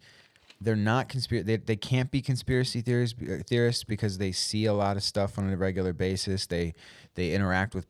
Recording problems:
none

